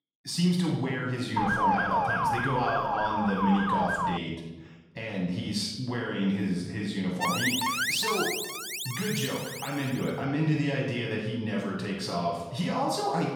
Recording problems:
off-mic speech; far
room echo; noticeable; dies away in 0.9 s
siren; loud; from 1.5 to 4 s; peak 5 dB above the speech
alarm; loud; from 7 to 10 s; peak 4 dB above the speech

